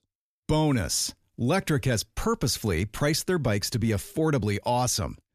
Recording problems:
none

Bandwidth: 14.5 kHz